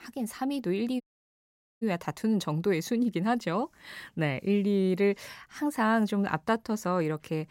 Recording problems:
audio cutting out; at 1 s for 1 s

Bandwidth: 16 kHz